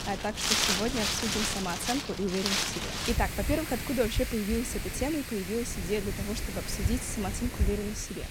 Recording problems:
wind in the background; very loud; throughout; 1 dB above the speech

